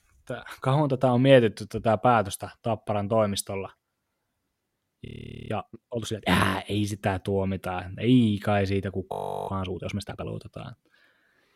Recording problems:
audio freezing; at 5 s and at 9 s

